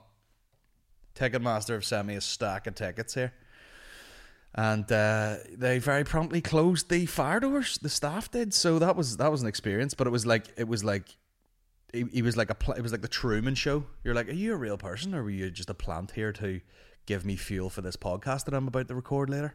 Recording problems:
none

